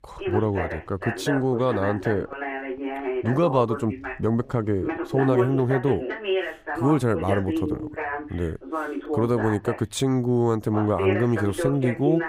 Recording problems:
voice in the background; loud; throughout; 5 dB below the speech

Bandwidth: 15.5 kHz